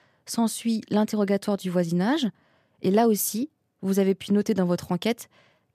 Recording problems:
none

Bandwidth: 14.5 kHz